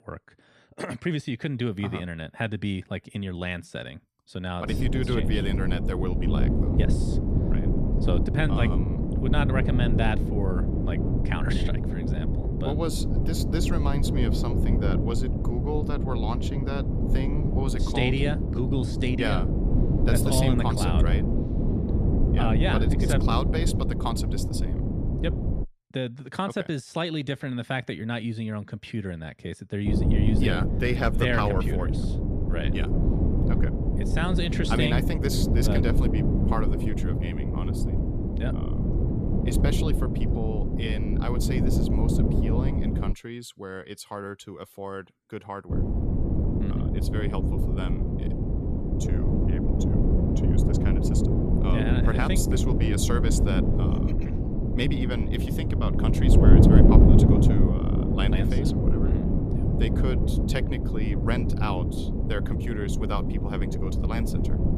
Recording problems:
wind noise on the microphone; heavy; from 4.5 to 26 s, from 30 to 43 s and from 46 s on; 1 dB below the speech

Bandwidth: 14.5 kHz